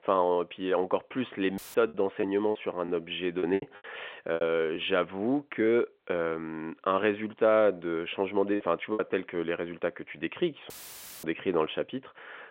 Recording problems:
phone-call audio; nothing above 3.5 kHz
audio cutting out; filled with static; at 1.5 s and at 11 s for 0.5 s
choppy; very; from 2 to 5 s and at 8.5 s; 14% of the speech affected

